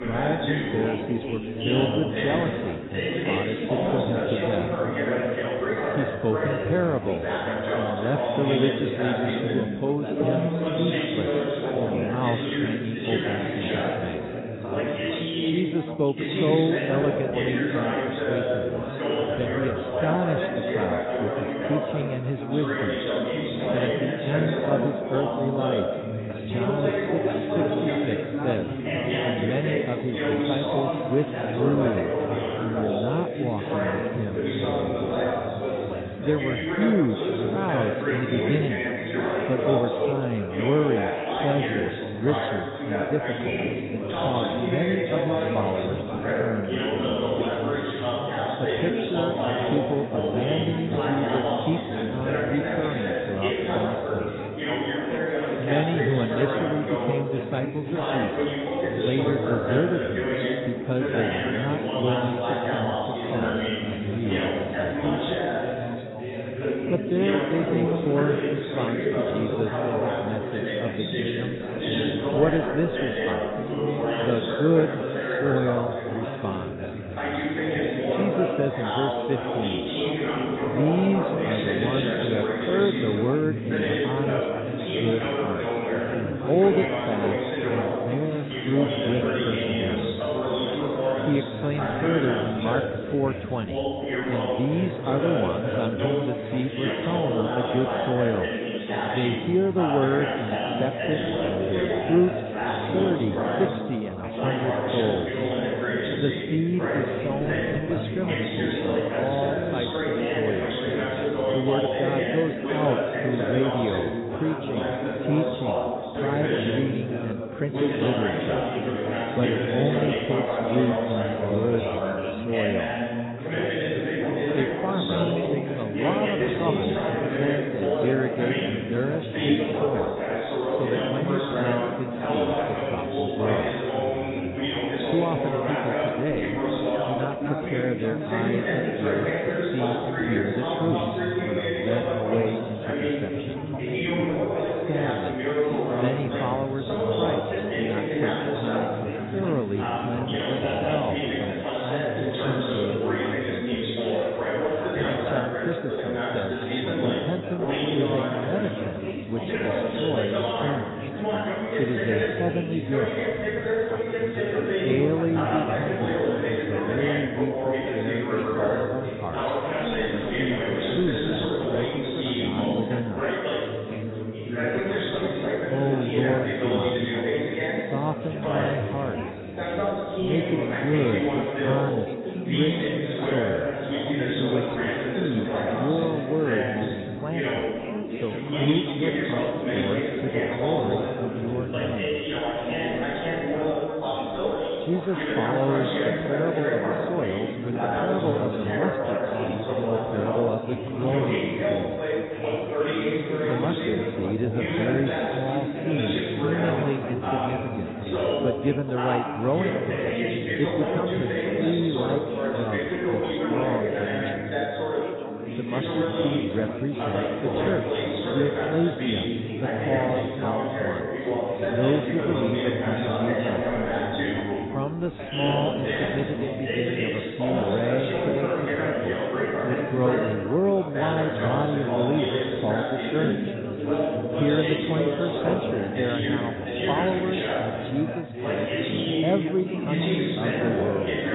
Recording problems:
garbled, watery; badly; nothing above 4 kHz
chatter from many people; very loud; throughout; 2 dB above the speech

